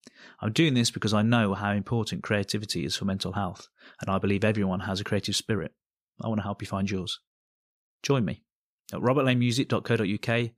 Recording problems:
none

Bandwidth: 15 kHz